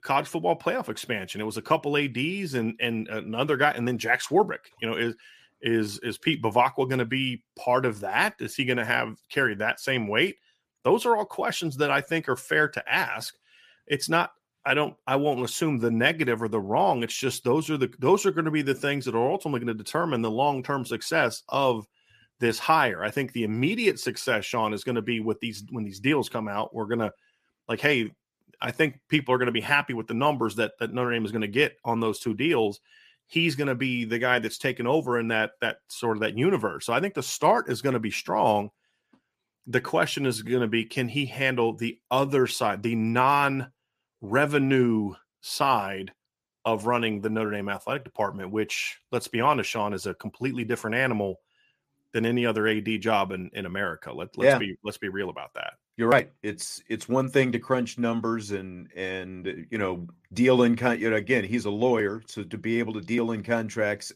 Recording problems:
none

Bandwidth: 14.5 kHz